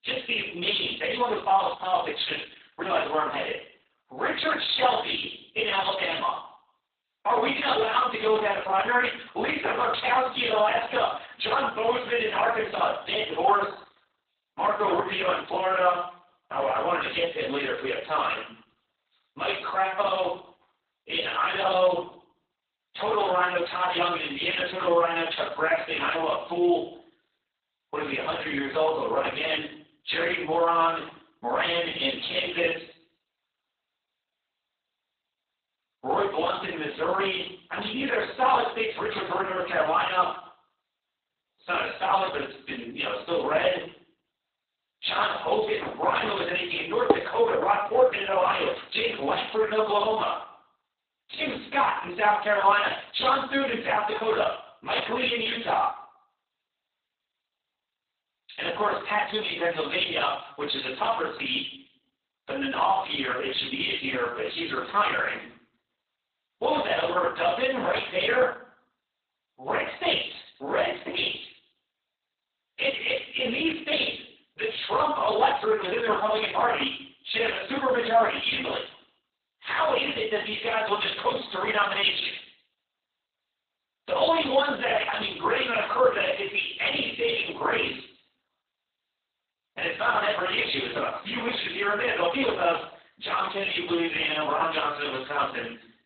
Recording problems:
off-mic speech; far
garbled, watery; badly; nothing above 4 kHz
room echo; noticeable; dies away in 0.5 s
thin; somewhat; fading below 400 Hz
clattering dishes; loud; at 47 s; peak 1 dB above the speech

